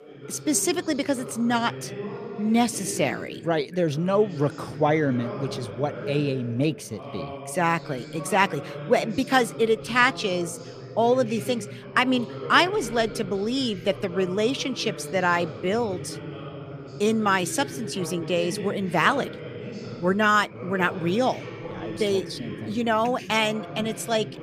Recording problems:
background chatter; noticeable; throughout; 2 voices, 10 dB below the speech

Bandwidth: 14.5 kHz